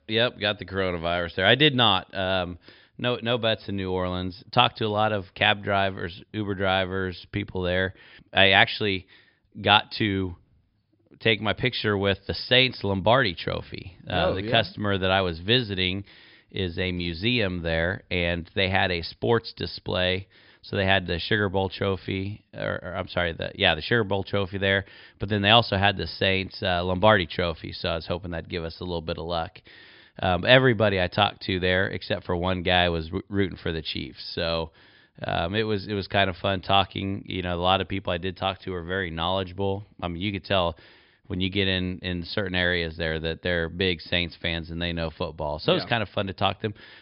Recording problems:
high frequencies cut off; noticeable; nothing above 5.5 kHz

